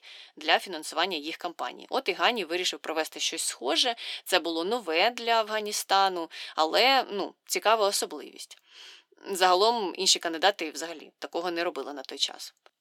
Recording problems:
thin; somewhat; fading below 350 Hz

